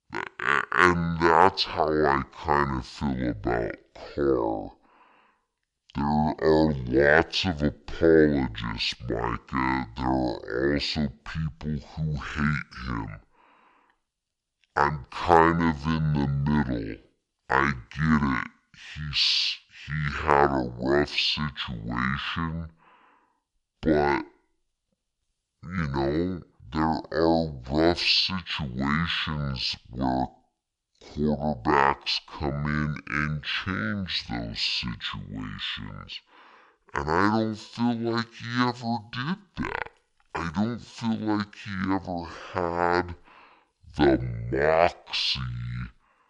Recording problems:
wrong speed and pitch; too slow and too low; 0.6 times normal speed

